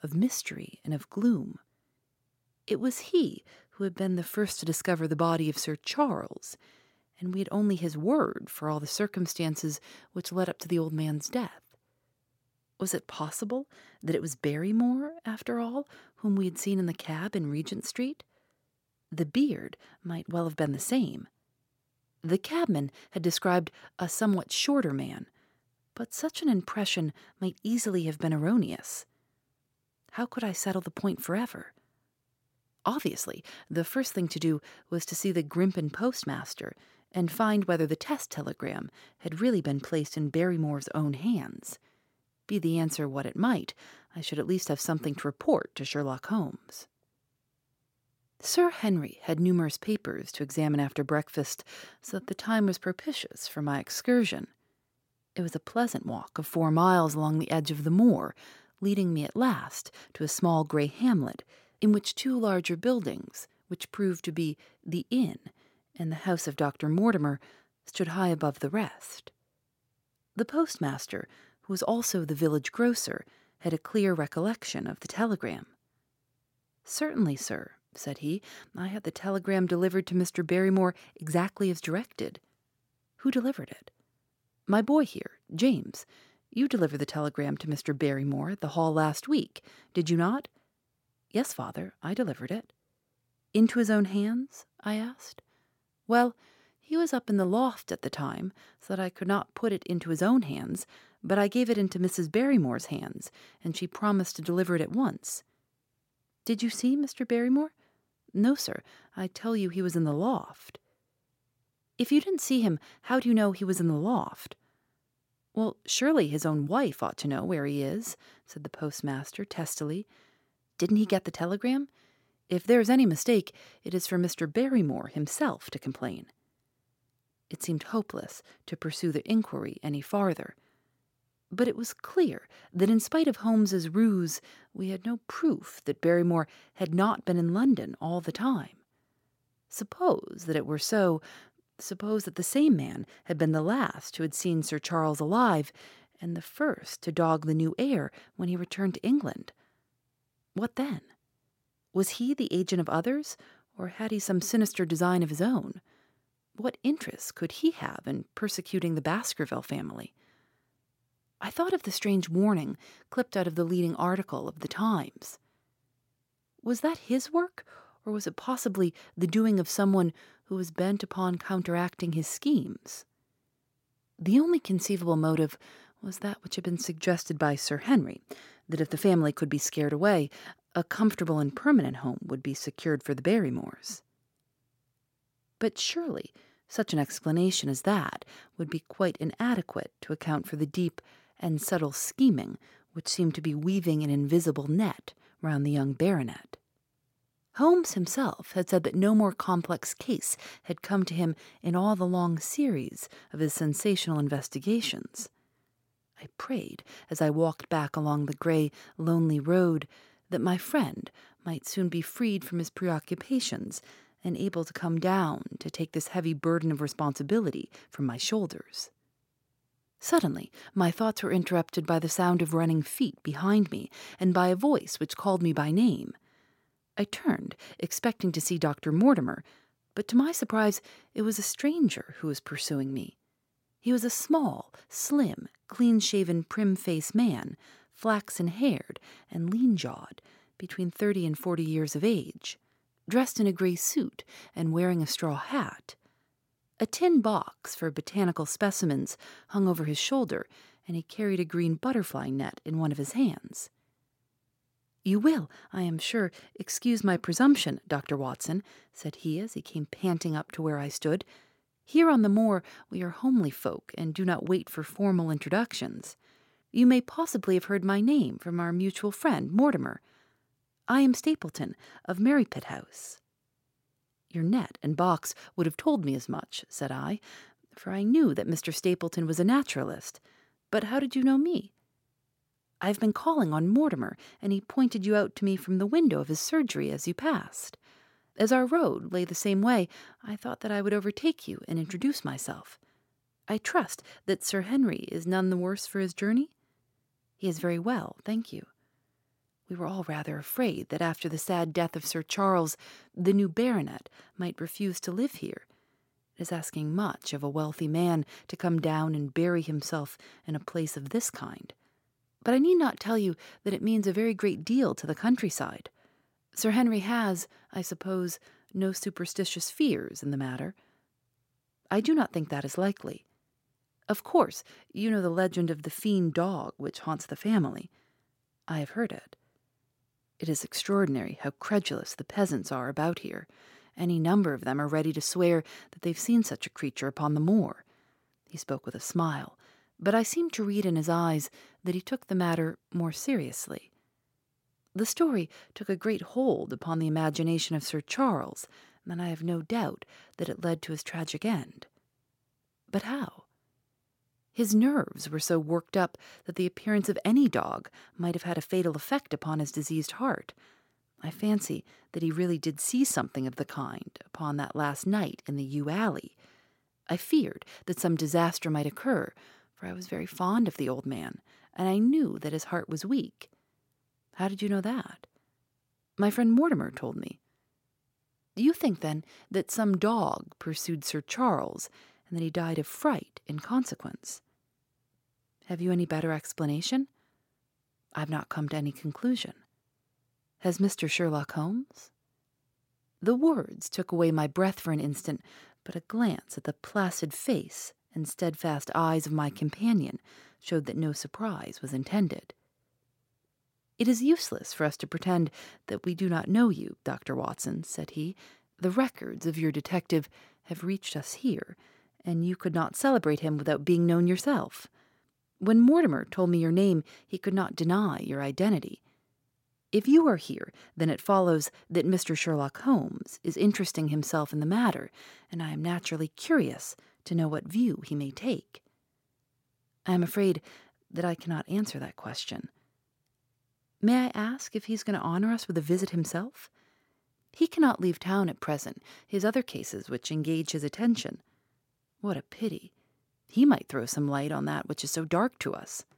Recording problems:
none

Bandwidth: 16.5 kHz